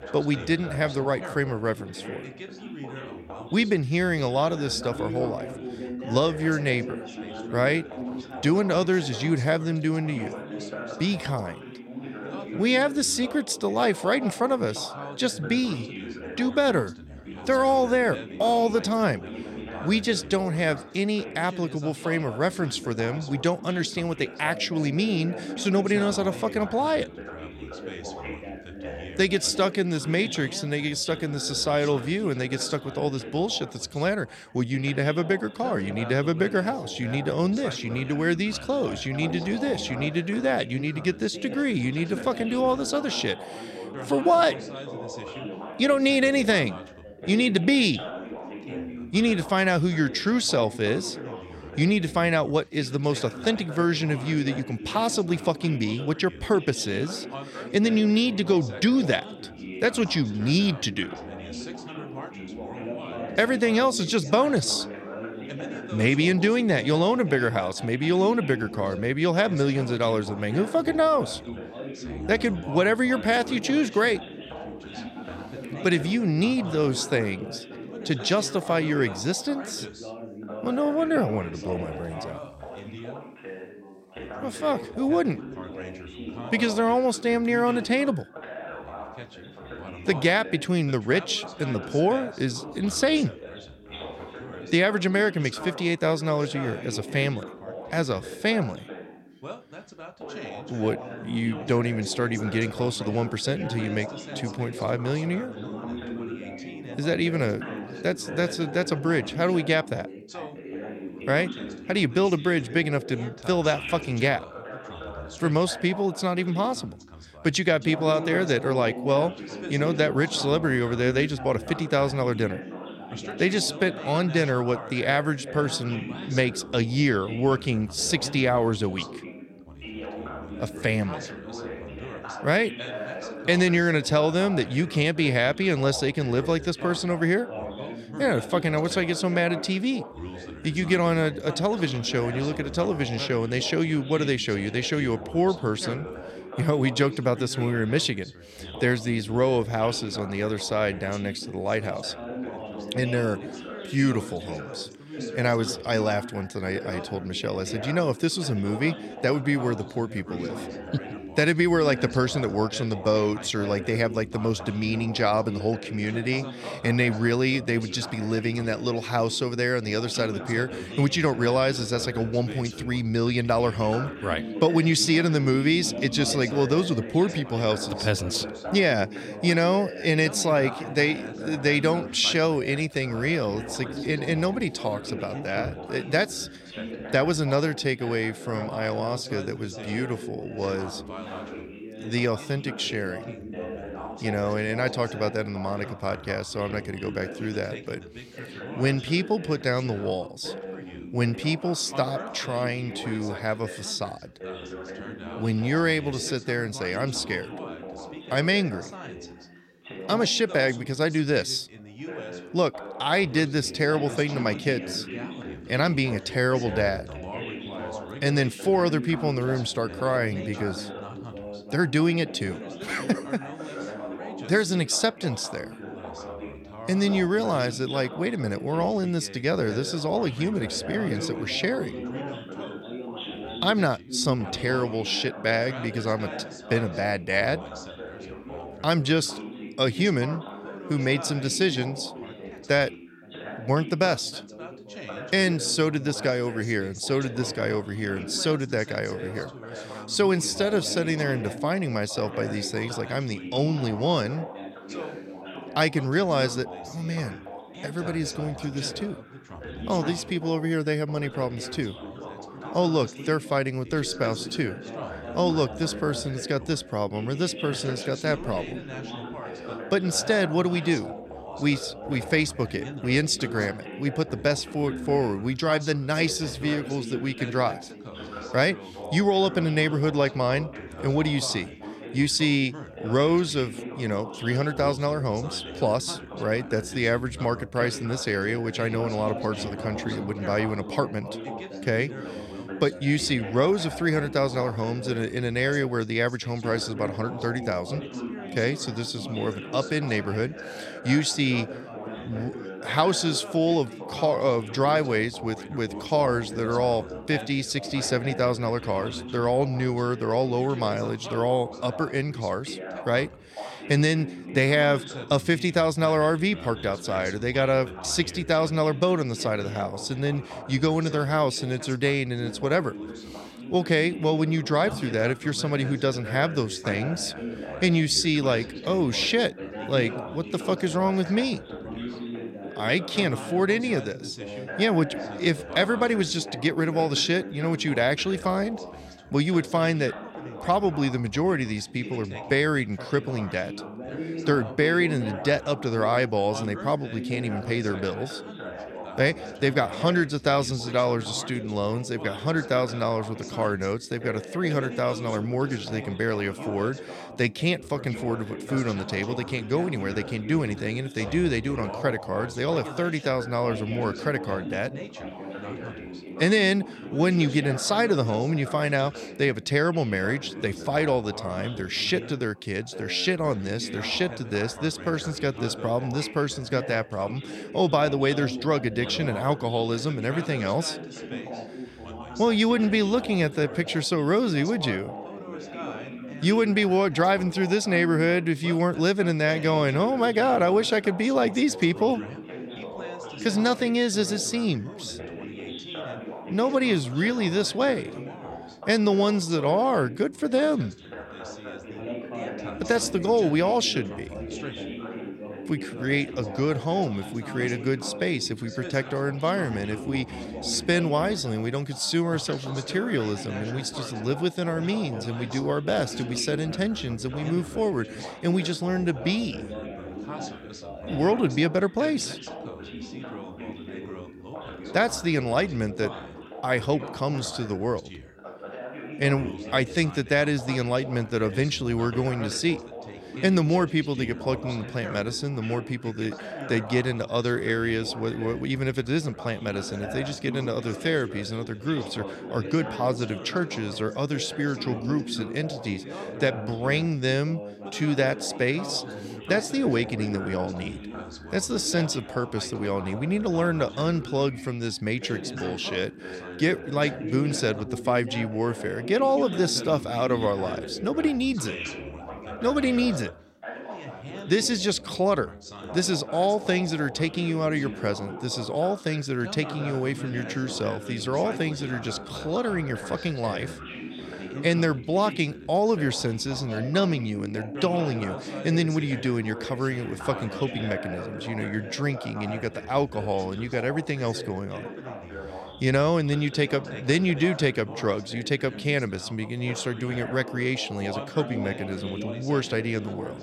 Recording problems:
background chatter; noticeable; throughout; 3 voices, 10 dB below the speech

